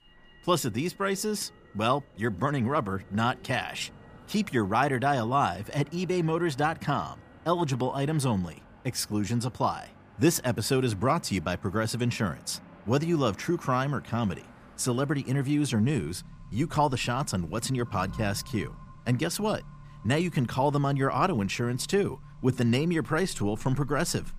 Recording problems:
traffic noise; faint; throughout; 20 dB below the speech

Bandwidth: 15 kHz